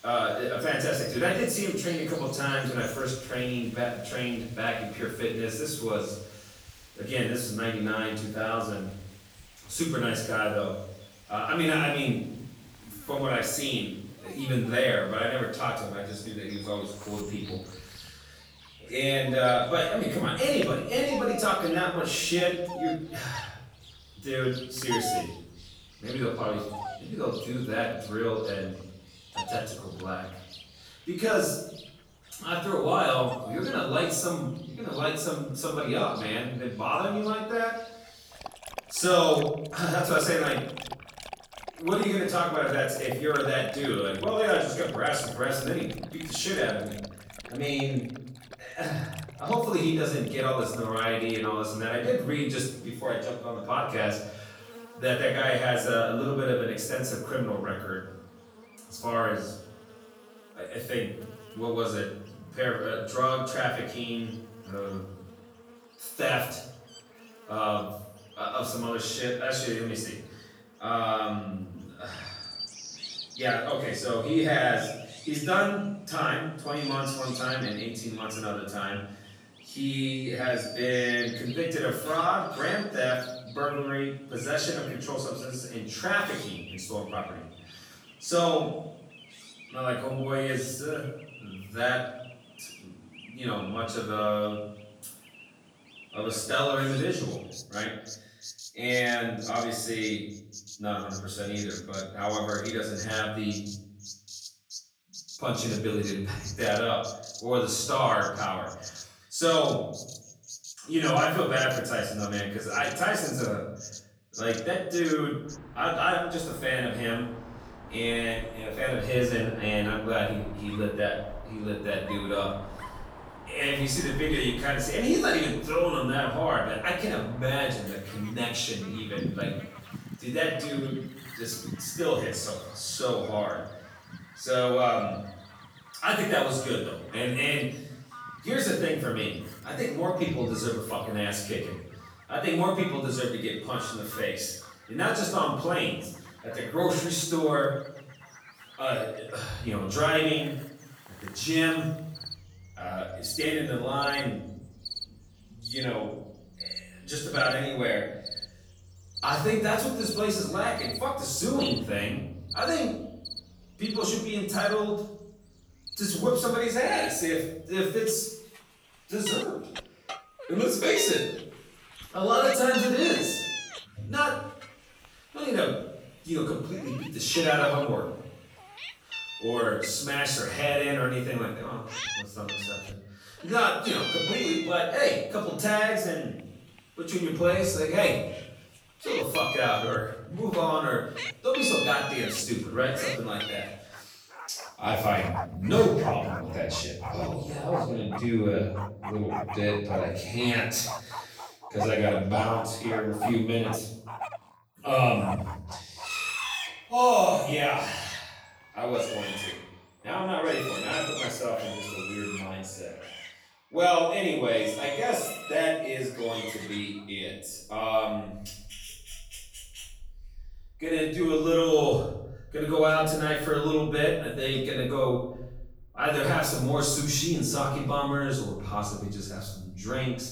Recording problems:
off-mic speech; far
room echo; noticeable; dies away in 0.8 s
animal sounds; noticeable; throughout; 10 dB below the speech

